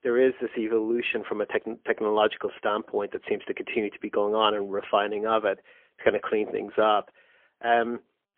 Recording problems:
phone-call audio; poor line; nothing above 3.5 kHz

